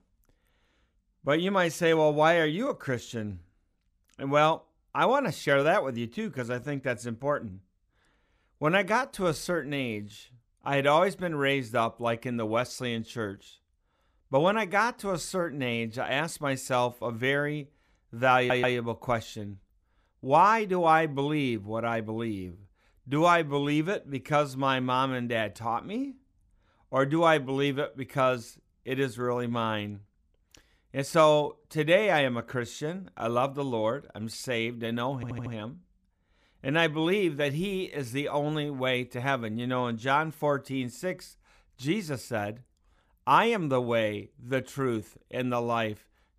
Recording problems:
audio stuttering; at 18 s and at 35 s

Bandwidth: 15 kHz